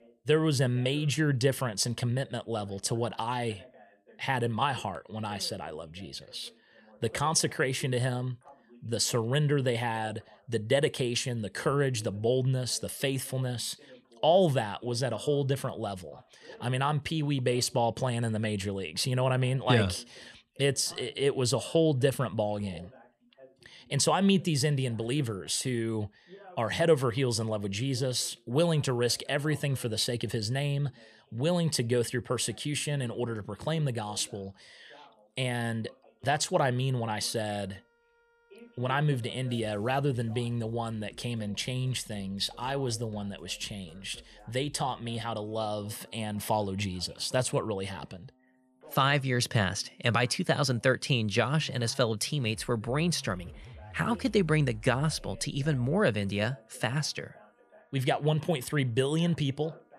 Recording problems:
background music; faint; from 36 s on; 25 dB below the speech
voice in the background; faint; throughout; 25 dB below the speech

